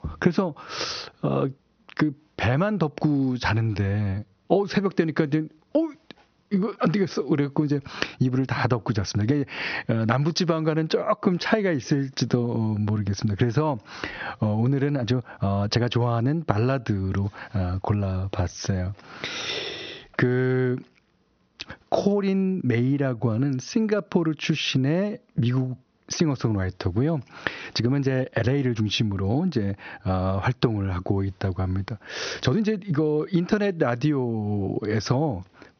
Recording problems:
squashed, flat; heavily
high frequencies cut off; noticeable; nothing above 6 kHz
uneven, jittery; strongly; from 3.5 to 33 s

